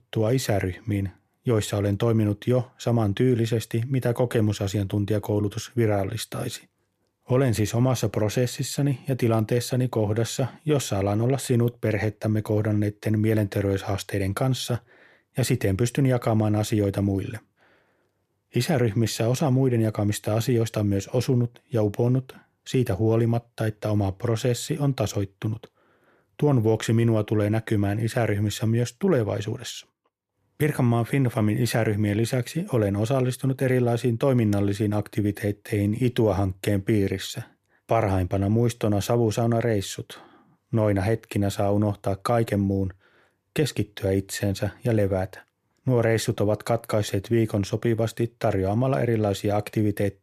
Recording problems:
none

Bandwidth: 14.5 kHz